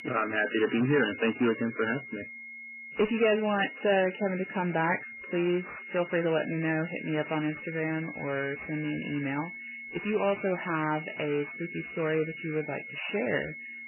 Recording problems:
garbled, watery; badly; nothing above 3 kHz
distortion; slight; 9 dB below the speech
high-pitched whine; loud; throughout; 600 Hz, 6 dB below the speech

